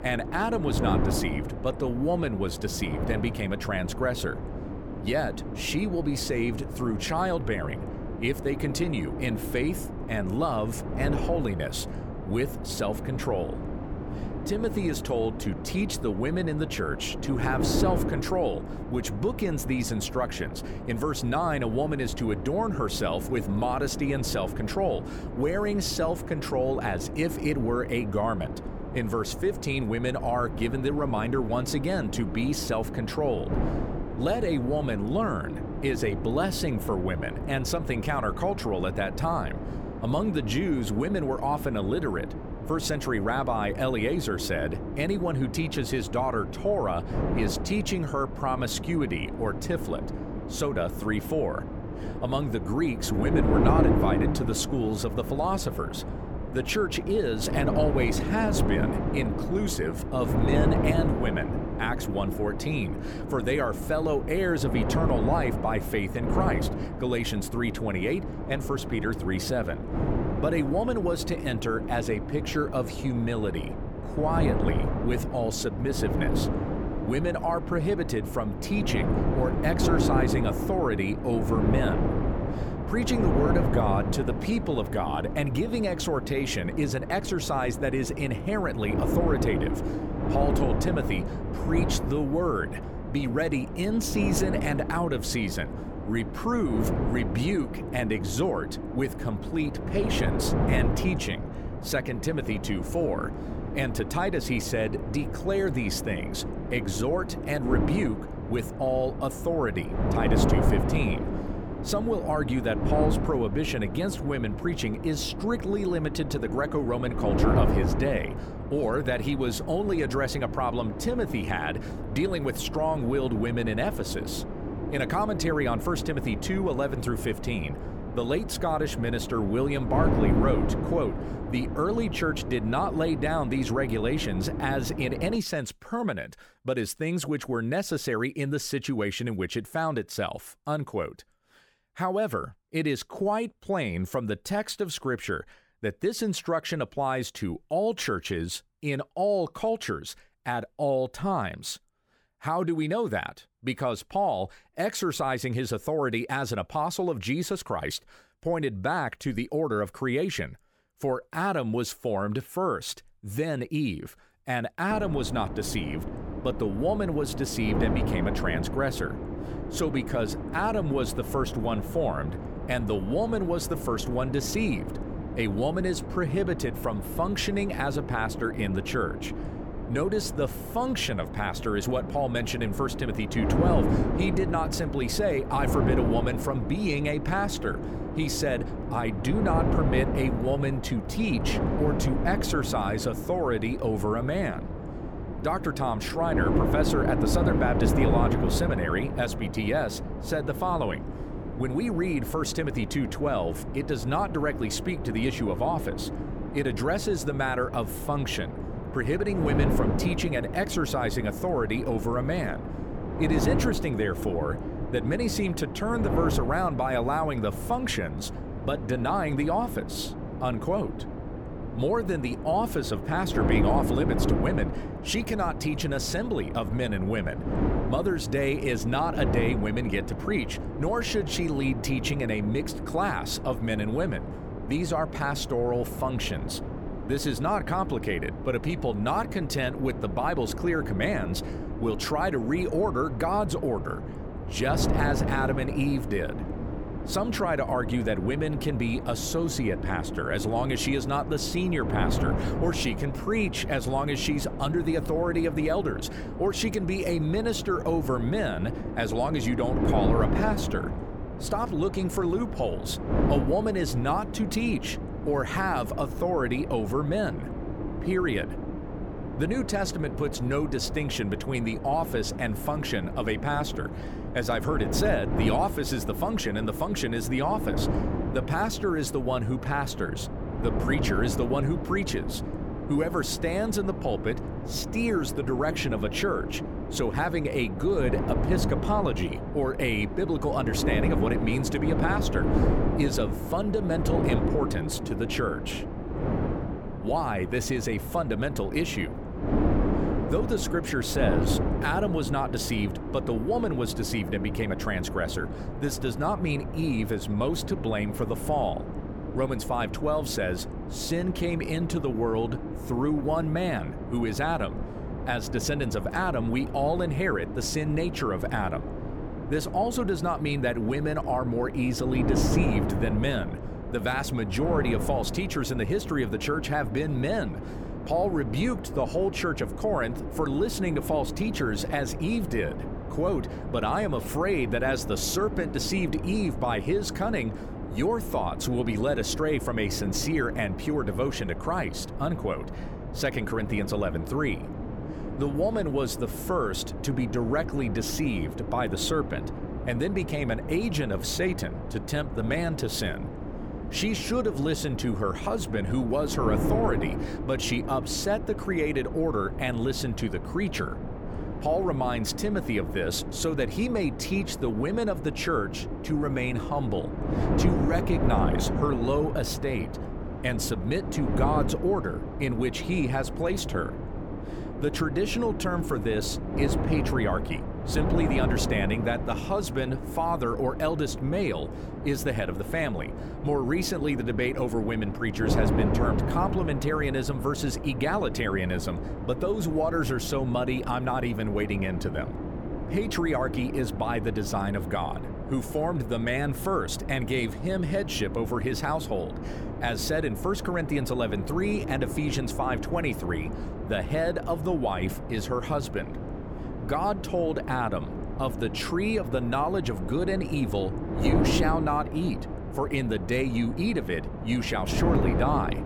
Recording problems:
wind noise on the microphone; heavy; until 2:15 and from 2:45 on; 7 dB below the speech

